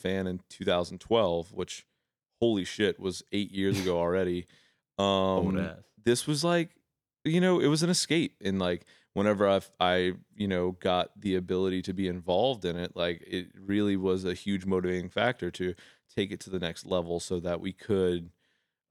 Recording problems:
none

